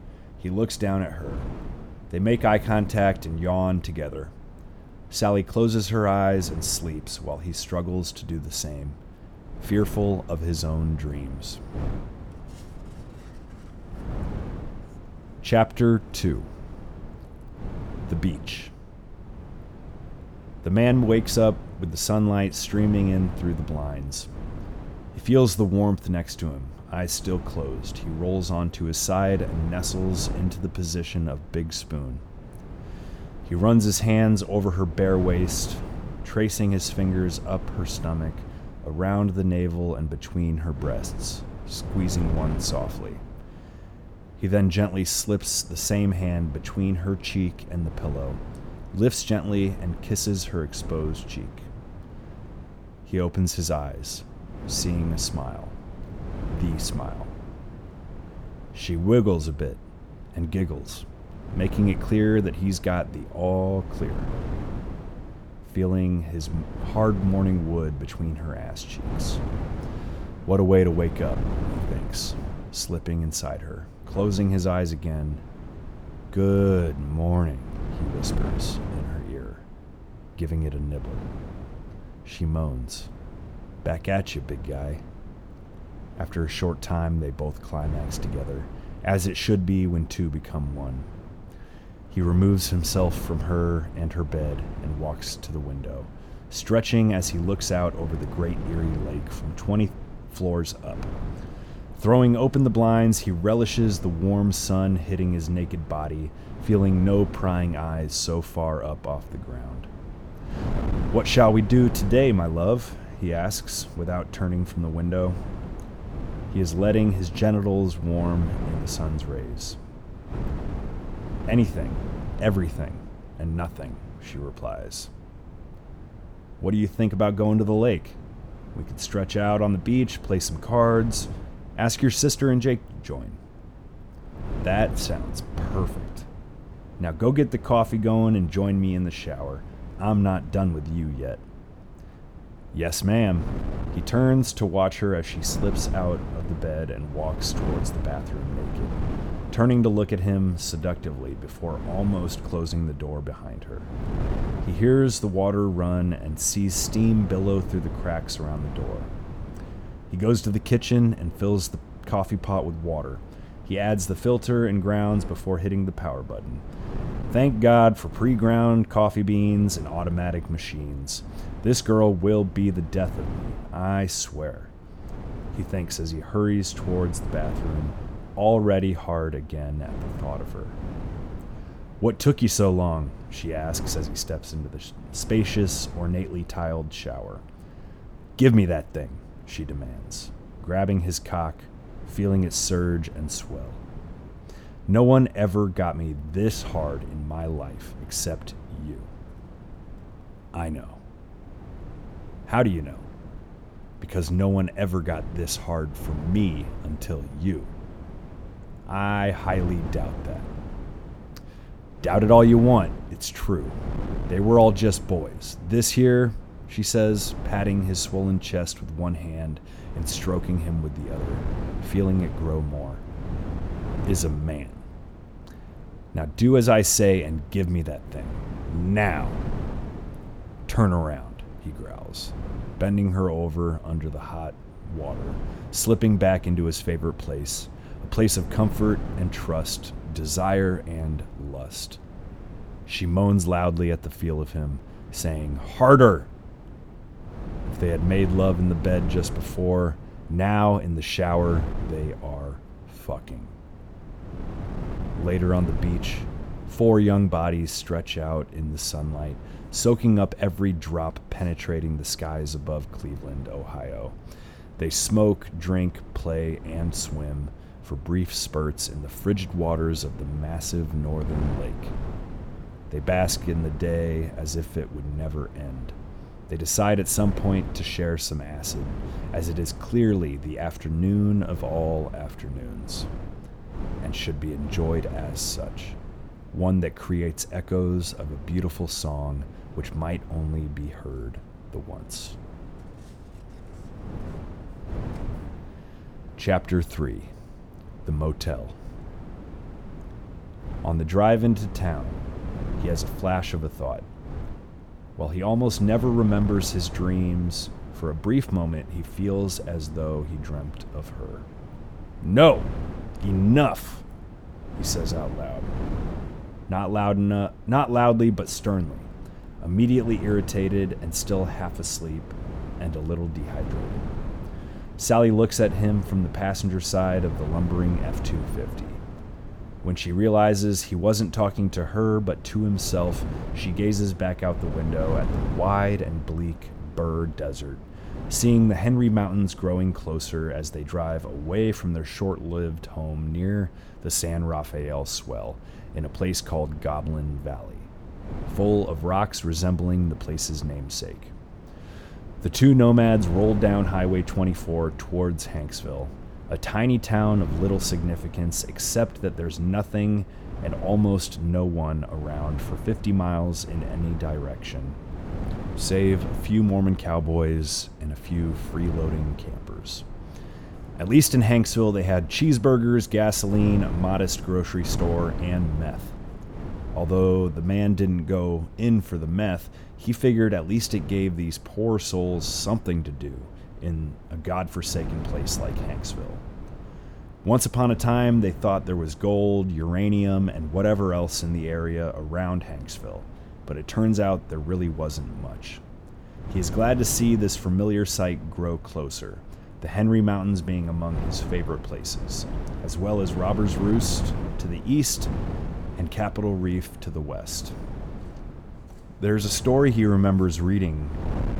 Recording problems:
wind noise on the microphone; occasional gusts; 15 dB below the speech

